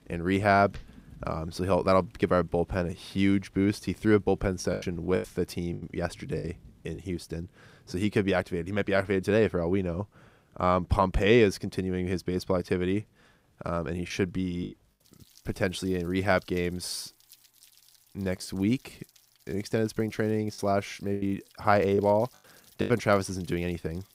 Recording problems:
rain or running water; faint; throughout; 30 dB below the speech
choppy; very; from 4.5 to 7 s, at 14 s and from 21 to 23 s; 11% of the speech affected

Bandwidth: 15.5 kHz